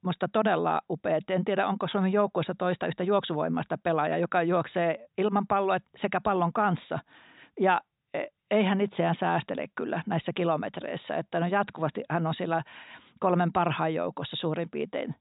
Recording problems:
high frequencies cut off; severe; nothing above 4 kHz

